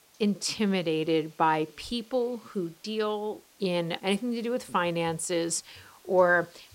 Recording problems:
hiss; faint; throughout; 30 dB below the speech

